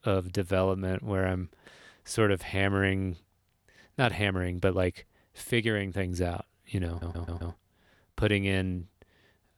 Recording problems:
audio stuttering; at 7 s

